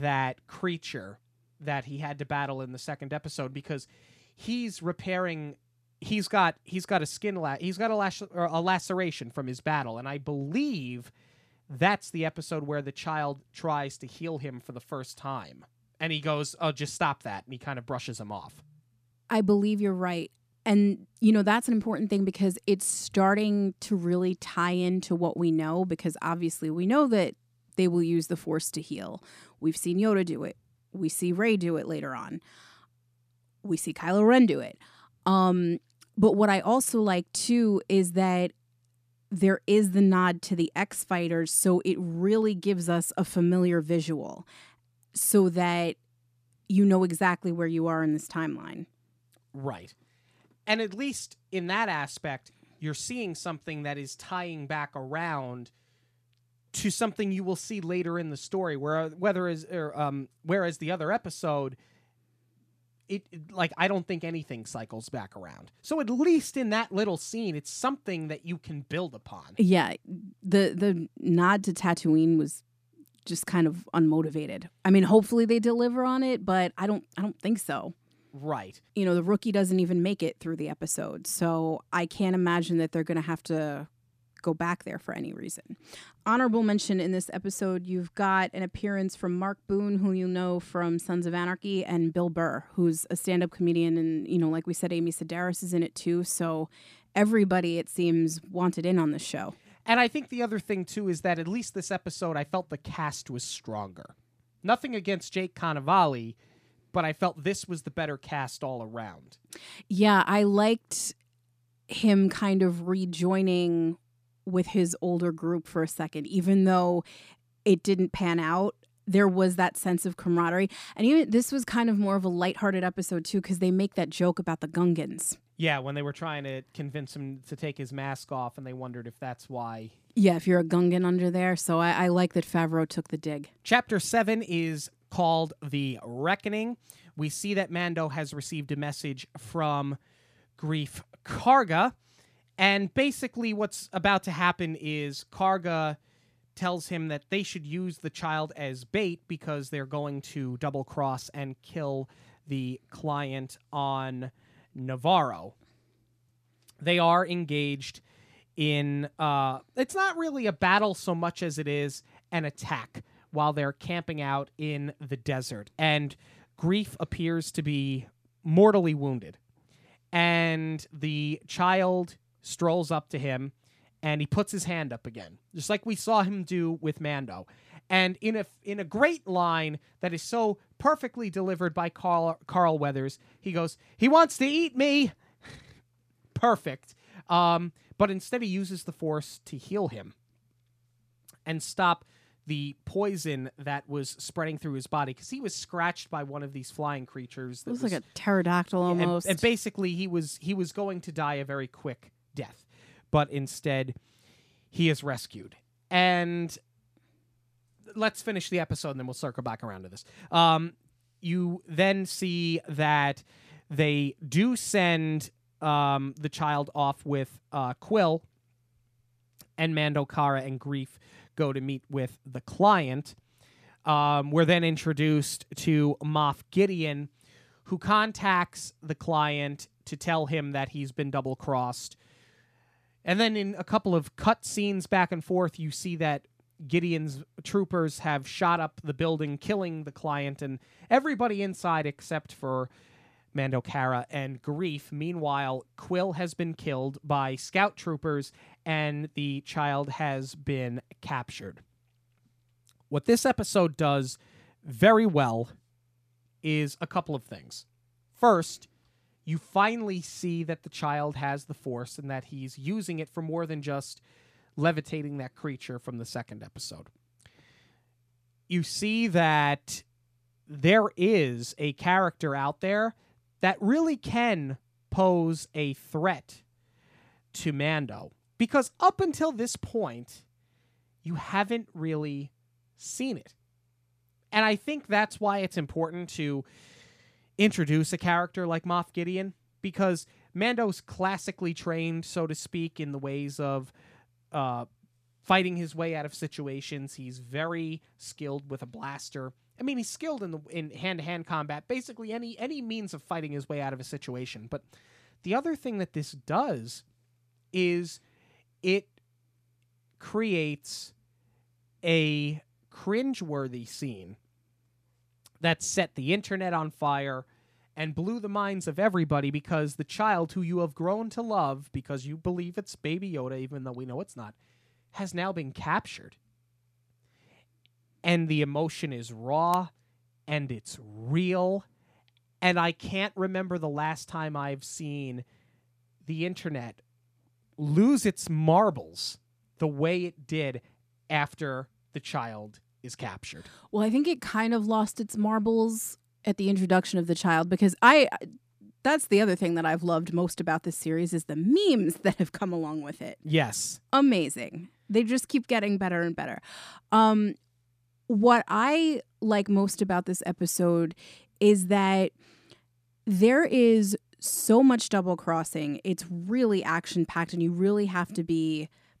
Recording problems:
abrupt cut into speech; at the start

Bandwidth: 14.5 kHz